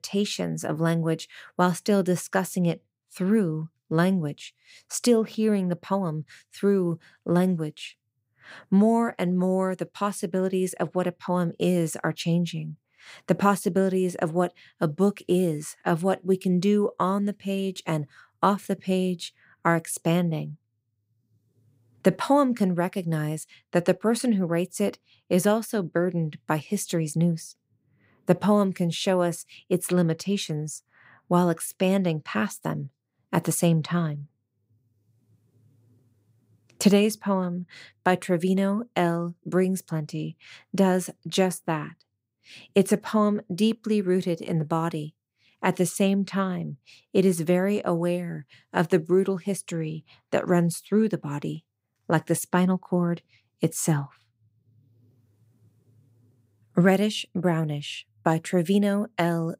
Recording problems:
none

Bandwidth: 15.5 kHz